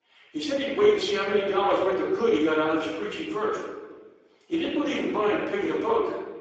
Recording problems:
off-mic speech; far
garbled, watery; badly; nothing above 7.5 kHz
room echo; noticeable; dies away in 1.1 s
thin; somewhat; fading below 300 Hz

